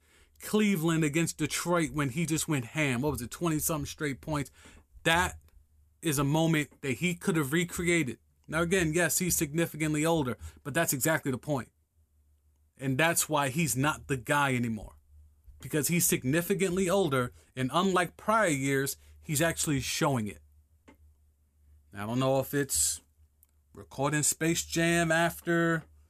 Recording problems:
none

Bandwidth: 14.5 kHz